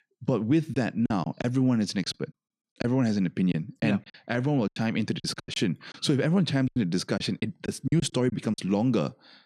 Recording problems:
choppy; very; 10% of the speech affected

